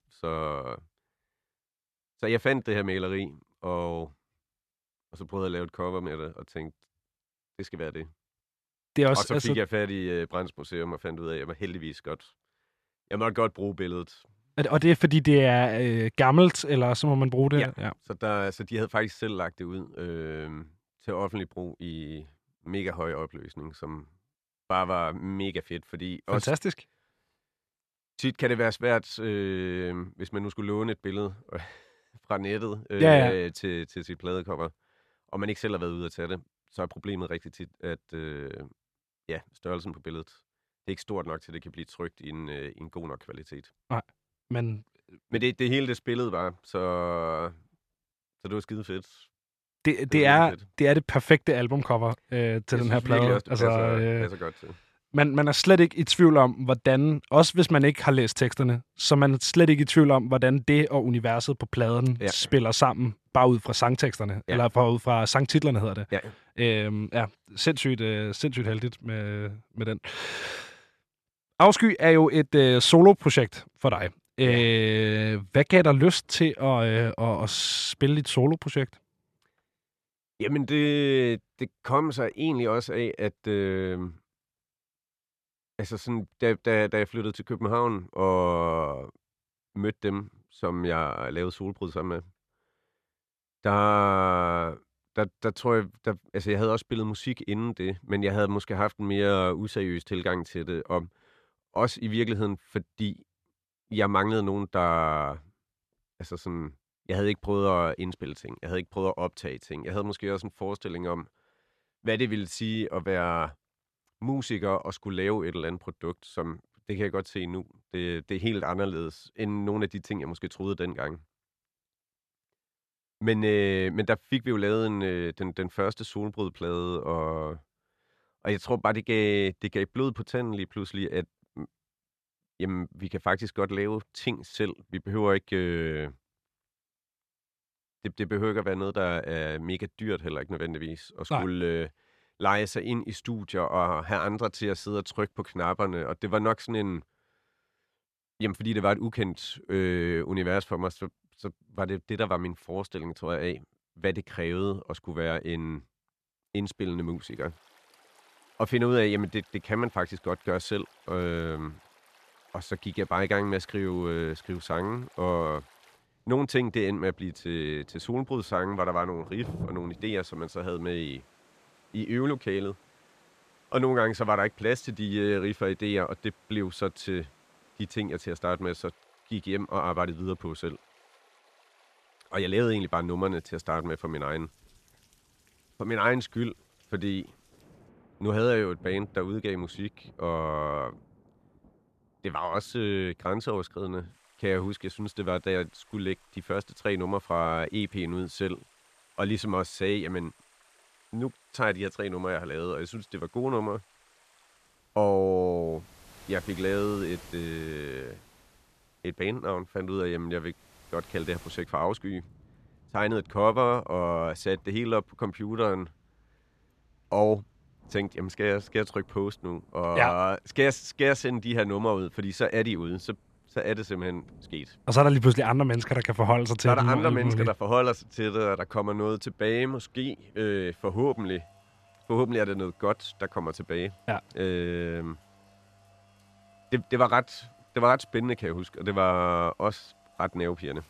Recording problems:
rain or running water; faint; from 2:37 on; 30 dB below the speech

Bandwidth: 14 kHz